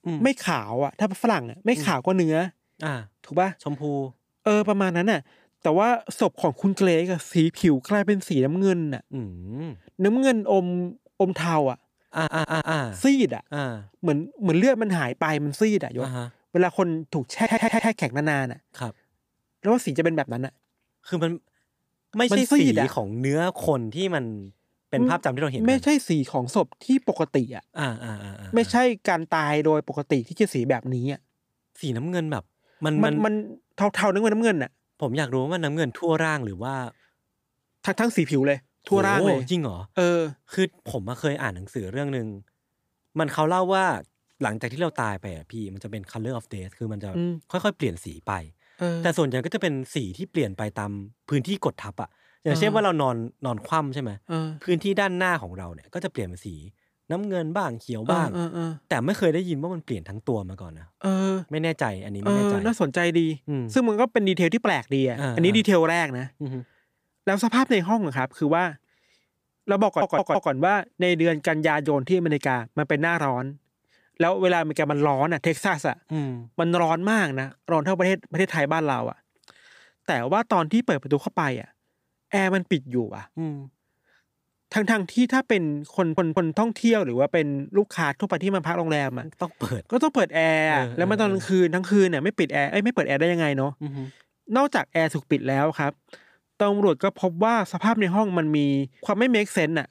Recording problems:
audio stuttering; 4 times, first at 12 s

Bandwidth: 15 kHz